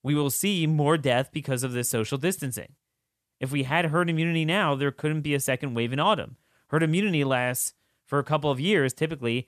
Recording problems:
none

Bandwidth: 13.5 kHz